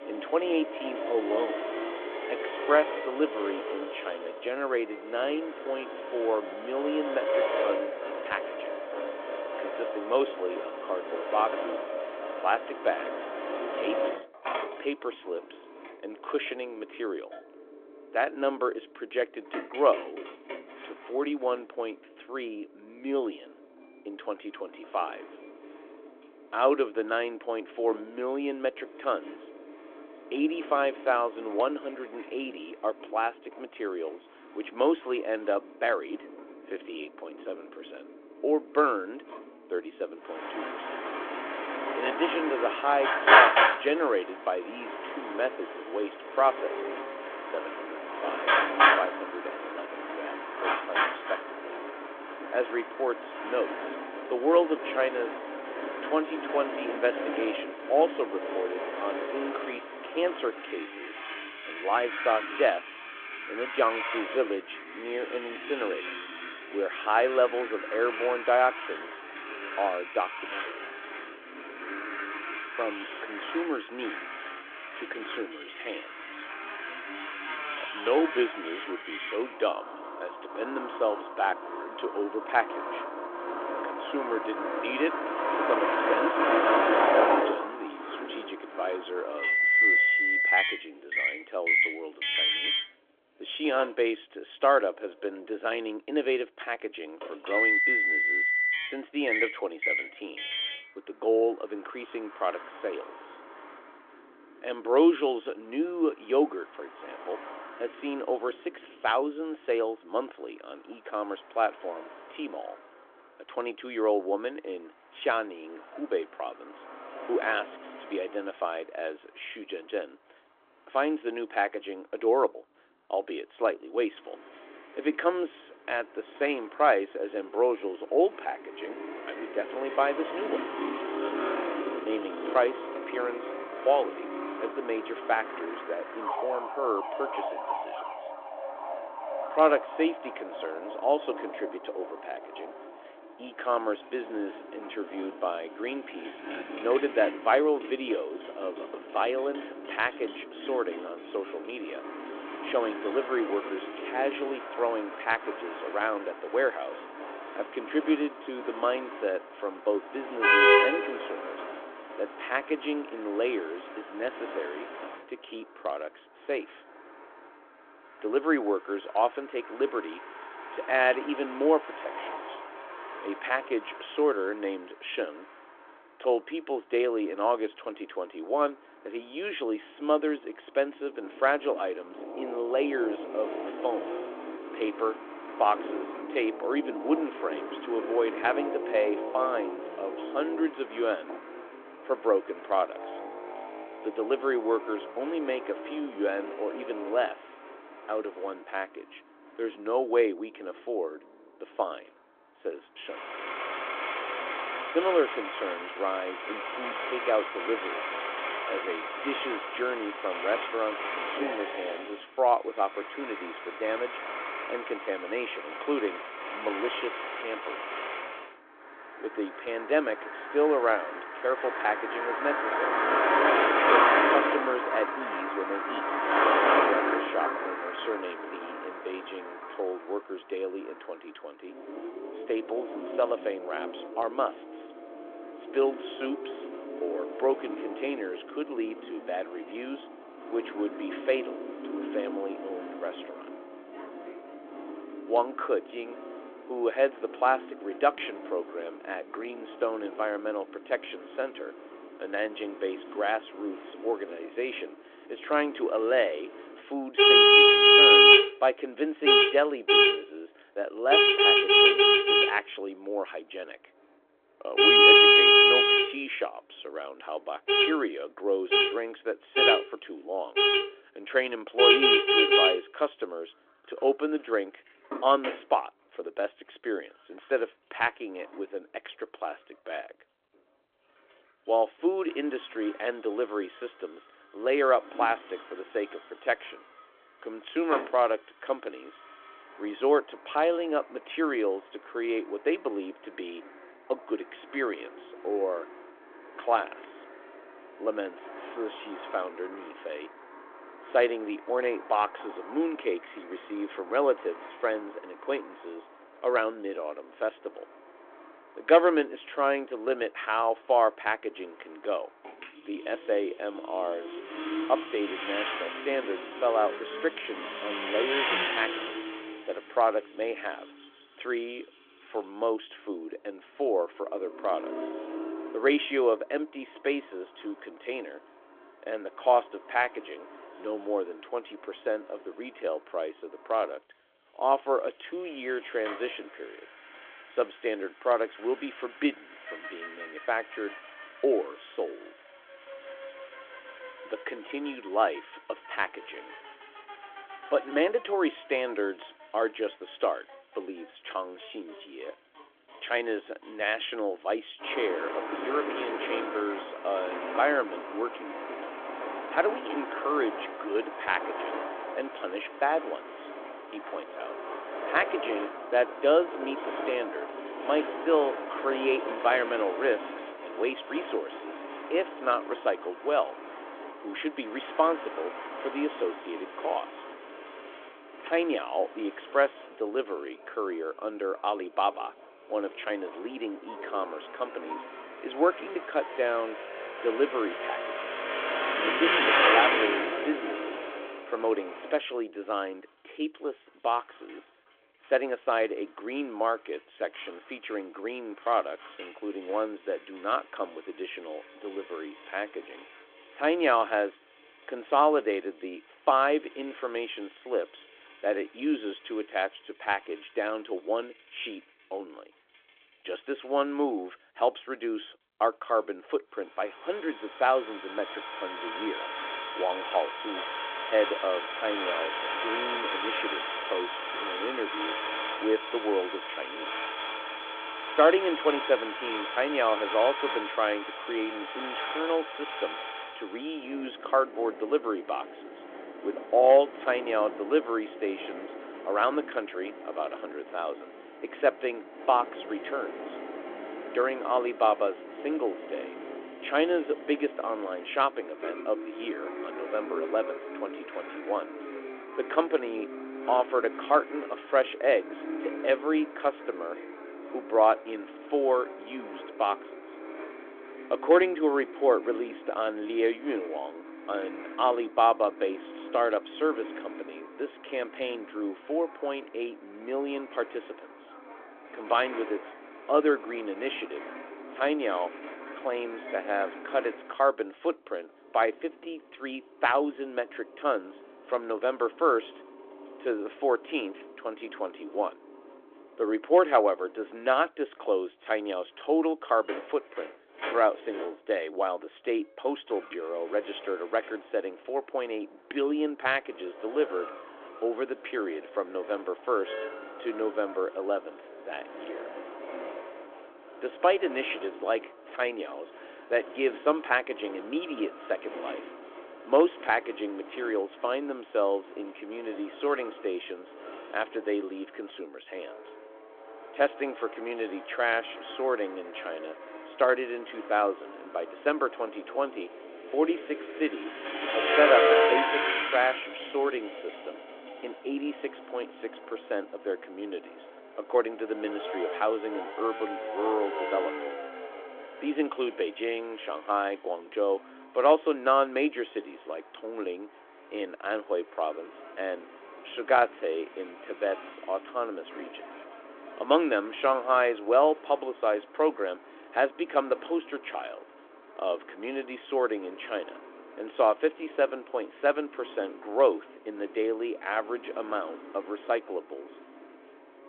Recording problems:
phone-call audio; nothing above 3.5 kHz
traffic noise; very loud; throughout; 2 dB above the speech

